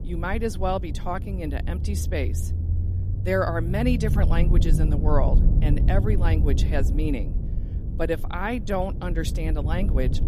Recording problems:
low rumble; loud; throughout; 10 dB below the speech

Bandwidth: 14 kHz